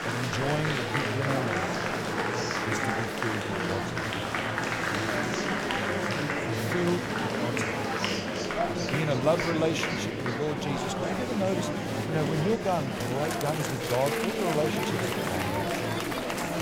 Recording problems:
murmuring crowd; very loud; throughout; 2 dB above the speech

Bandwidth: 17.5 kHz